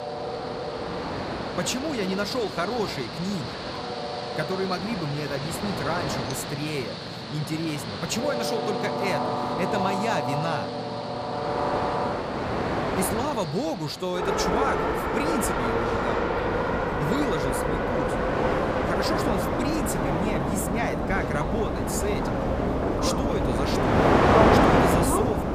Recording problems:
train or aircraft noise; very loud; throughout; 4 dB above the speech

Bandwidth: 15 kHz